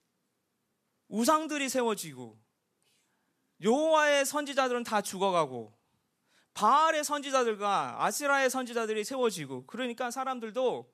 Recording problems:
none

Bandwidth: 14 kHz